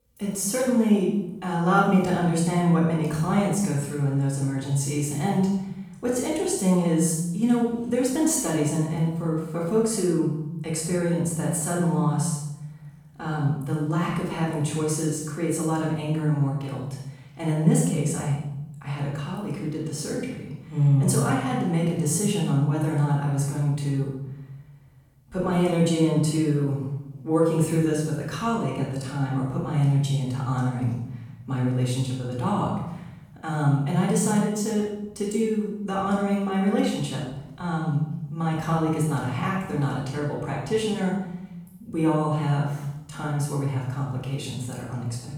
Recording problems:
off-mic speech; far
room echo; noticeable; dies away in 0.9 s

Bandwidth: 18 kHz